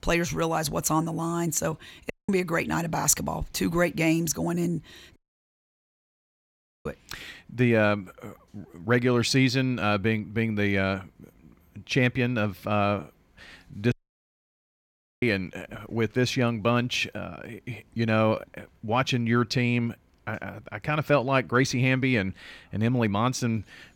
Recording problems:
audio cutting out; at 2 s, at 5 s for 1.5 s and at 14 s for 1.5 s

